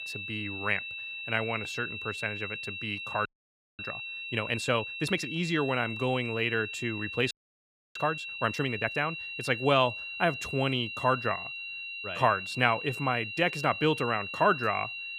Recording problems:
high-pitched whine; loud; throughout; 2.5 kHz, 6 dB below the speech
audio freezing; at 3.5 s for 0.5 s and at 7.5 s for 0.5 s

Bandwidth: 15 kHz